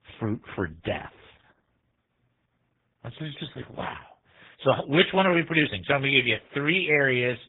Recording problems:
garbled, watery; badly
high frequencies cut off; severe; nothing above 3.5 kHz

